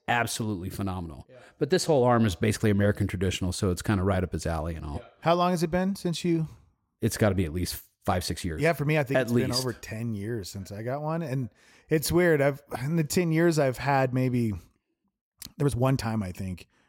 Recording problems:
uneven, jittery; strongly; from 2.5 to 16 s

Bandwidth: 16.5 kHz